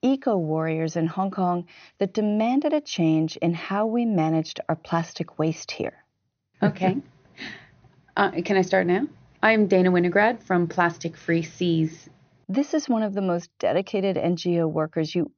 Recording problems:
high frequencies cut off; noticeable; nothing above 6.5 kHz

